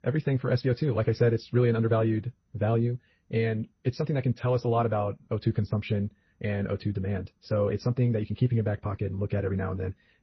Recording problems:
wrong speed, natural pitch; too fast; 1.5 times normal speed
garbled, watery; slightly; nothing above 5.5 kHz

